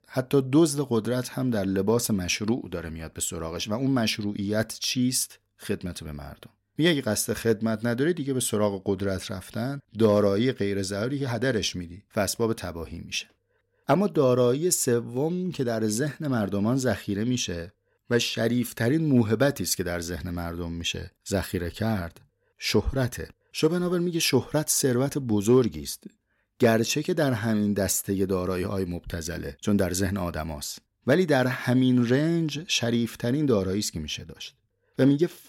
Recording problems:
none

